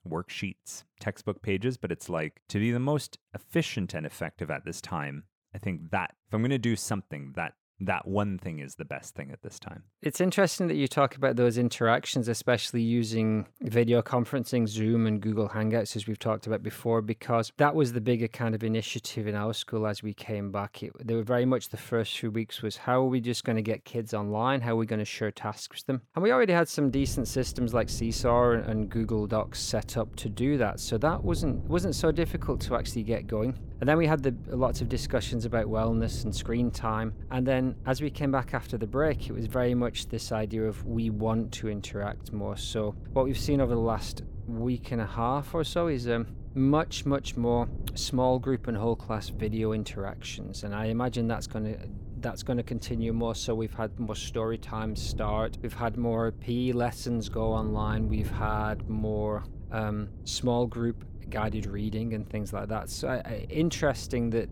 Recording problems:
wind noise on the microphone; occasional gusts; from 27 s on; 20 dB below the speech

